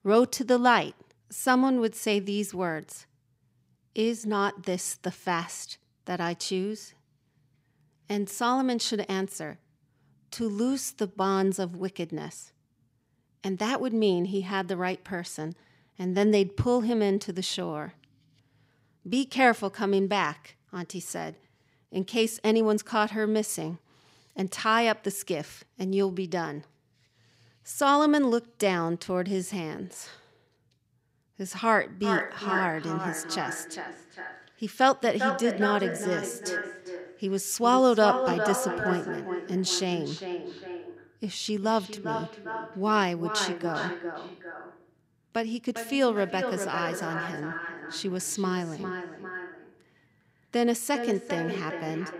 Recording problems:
echo of what is said; strong; from 32 s on; 400 ms later, 6 dB below the speech

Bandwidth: 15.5 kHz